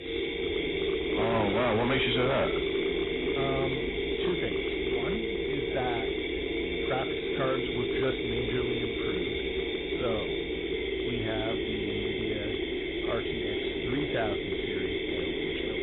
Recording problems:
garbled, watery; badly; nothing above 4 kHz
distortion; slight; 7% of the sound clipped
machinery noise; very loud; throughout; 3 dB above the speech

